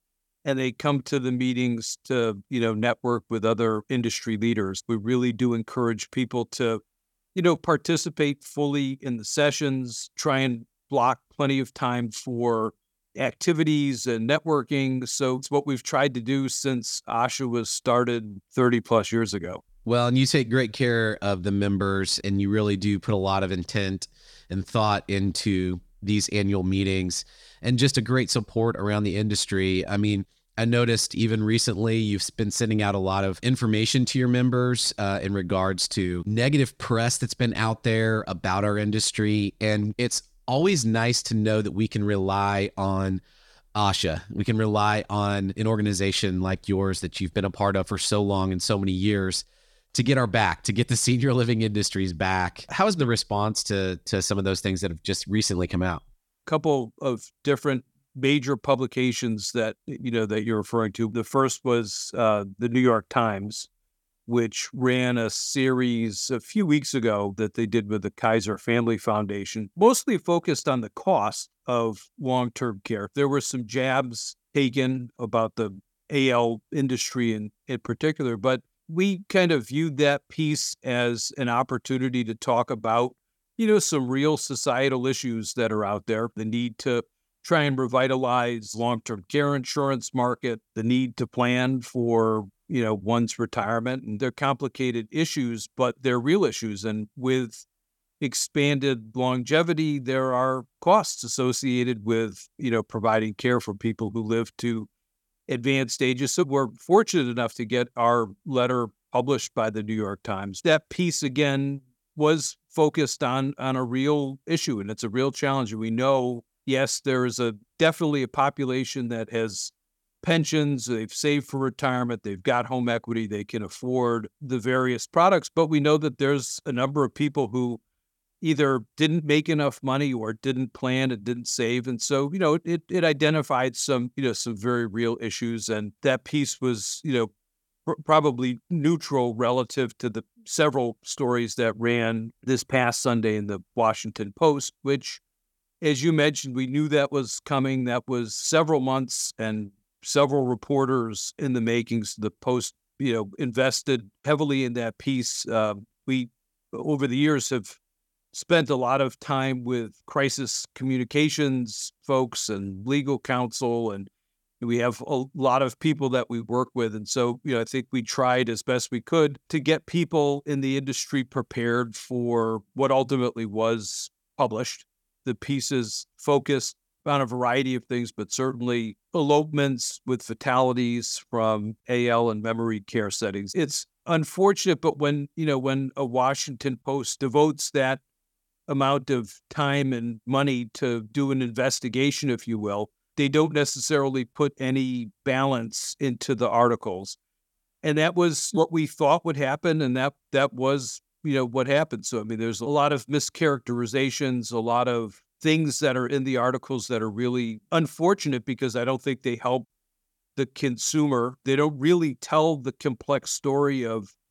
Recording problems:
none

